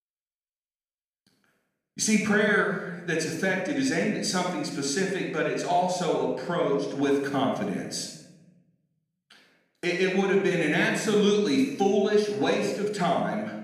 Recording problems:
room echo; noticeable; dies away in 0.9 s
off-mic speech; somewhat distant

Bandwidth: 14.5 kHz